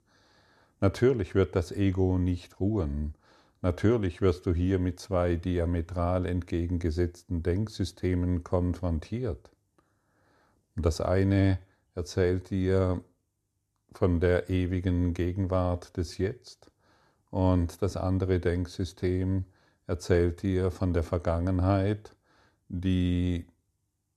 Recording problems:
none

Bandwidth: 13.5 kHz